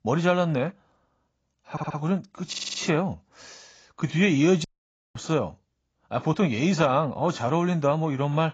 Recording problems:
garbled, watery; badly; nothing above 7.5 kHz
audio stuttering; at 1.5 s and at 2.5 s
audio cutting out; at 4.5 s for 0.5 s

